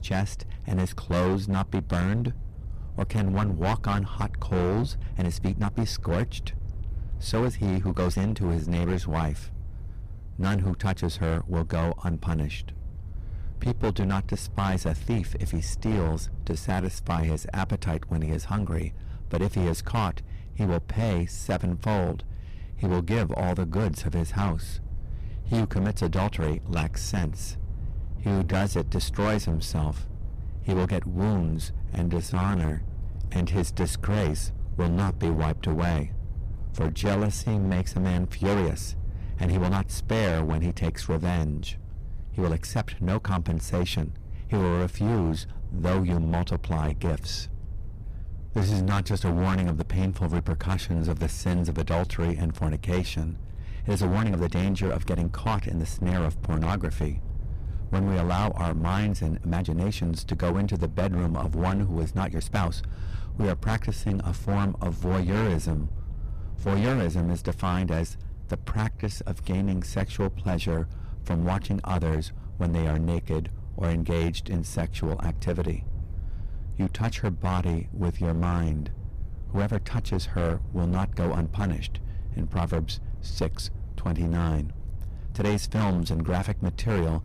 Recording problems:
distortion; heavy; 14% of the sound clipped
wind noise on the microphone; occasional gusts; 15 dB below the speech
uneven, jittery; strongly; from 5 s to 1:26

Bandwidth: 14.5 kHz